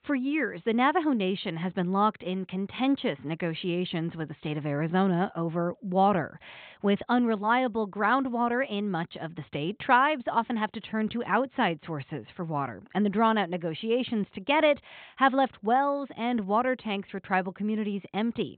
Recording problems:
high frequencies cut off; severe; nothing above 4 kHz

